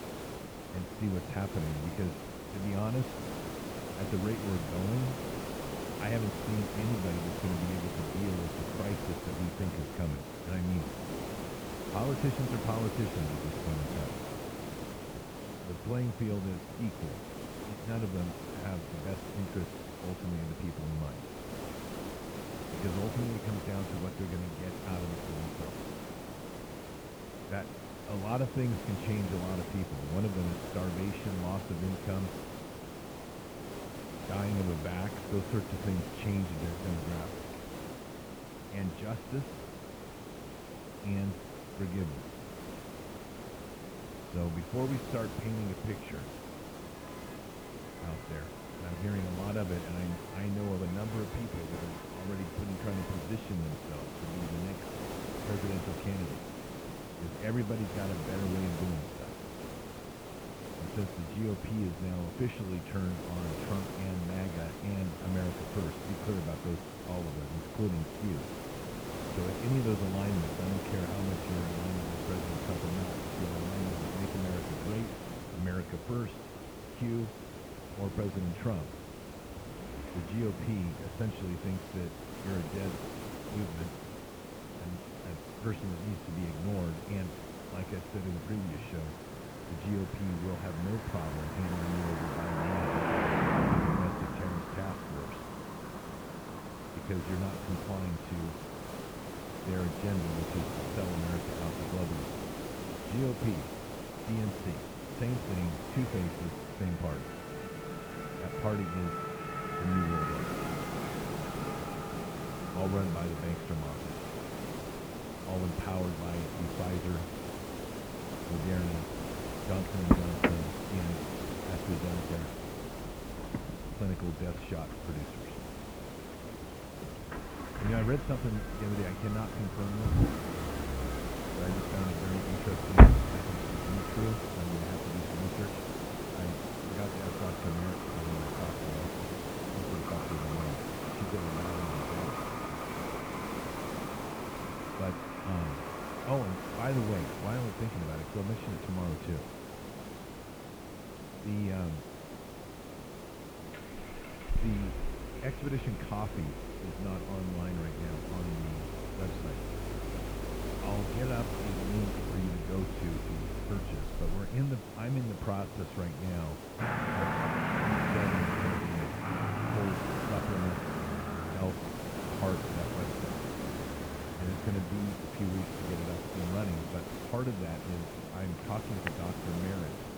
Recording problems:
muffled; very; fading above 2.5 kHz
traffic noise; very loud; throughout; 1 dB above the speech
hiss; loud; throughout; 4 dB below the speech
electrical hum; faint; throughout; 50 Hz, 25 dB below the speech

